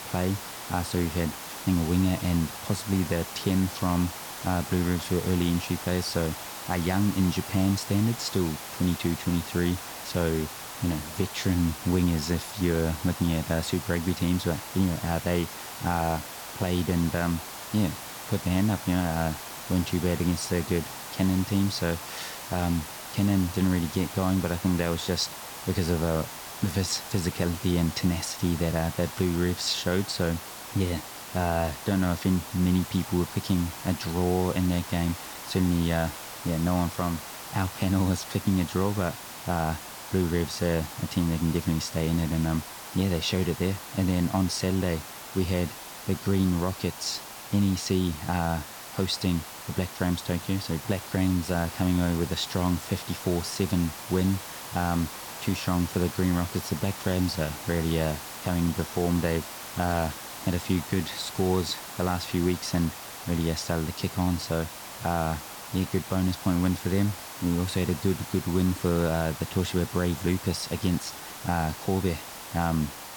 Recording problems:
hiss; loud; throughout; 10 dB below the speech

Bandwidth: 18.5 kHz